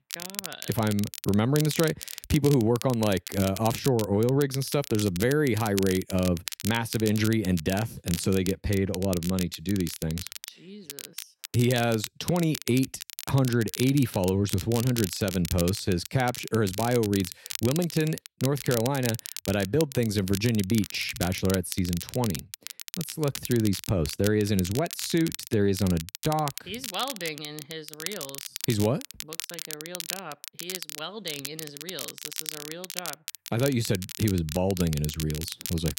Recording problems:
crackle, like an old record; loud; 10 dB below the speech

